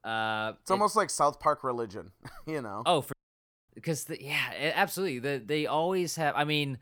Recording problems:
audio cutting out; at 3 s for 0.5 s

